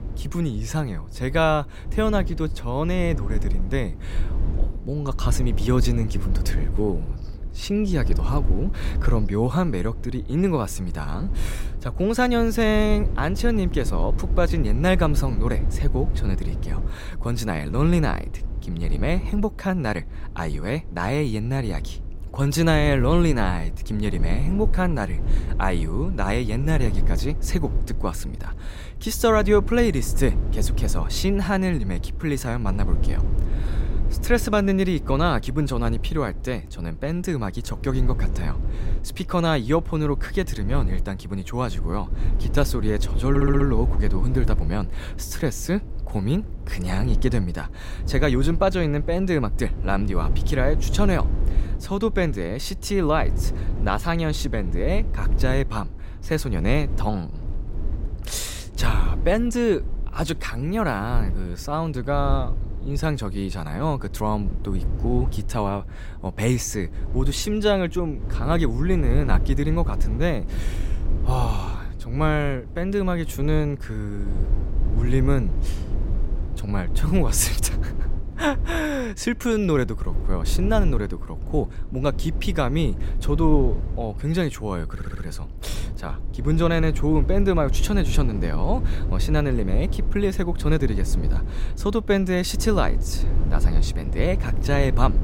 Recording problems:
low rumble; noticeable; throughout; 15 dB below the speech
audio stuttering; at 43 s and at 1:25

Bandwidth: 16 kHz